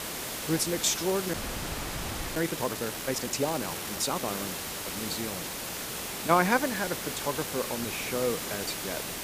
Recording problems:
hiss; loud; throughout; 3 dB below the speech
audio freezing; at 1.5 s for 1 s

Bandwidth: 15 kHz